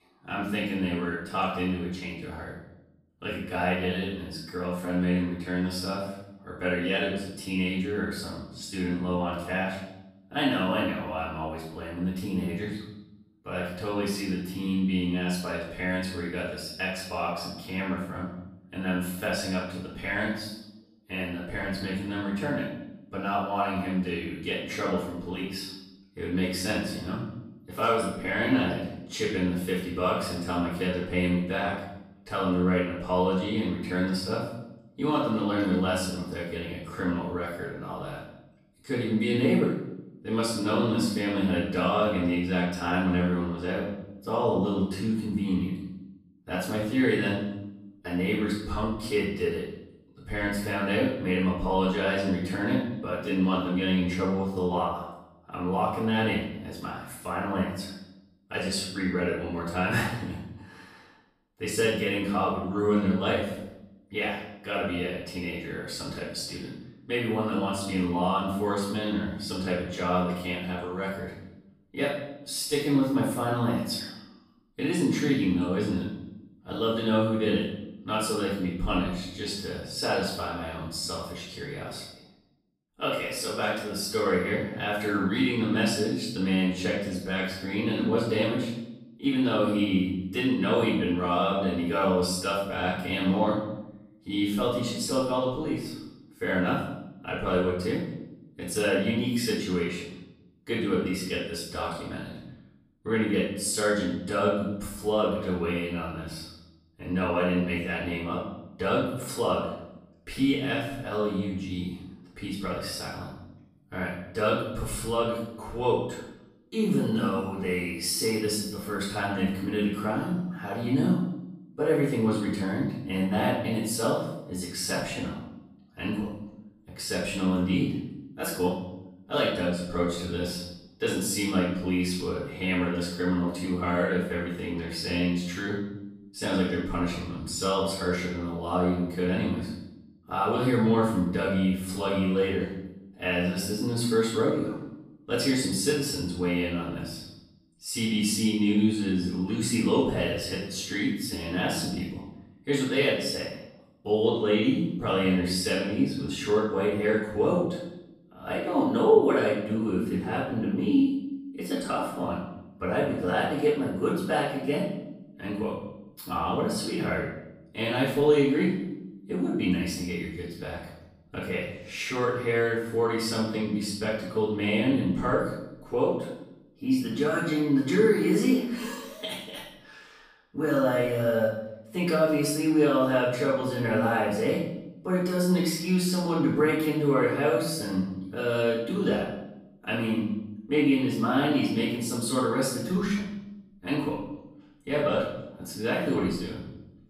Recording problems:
off-mic speech; far
room echo; noticeable; dies away in 0.8 s

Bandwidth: 15 kHz